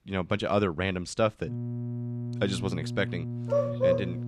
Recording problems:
electrical hum; noticeable; from 1.5 s on; 60 Hz, 15 dB below the speech
dog barking; loud; at 3.5 s; peak 4 dB above the speech

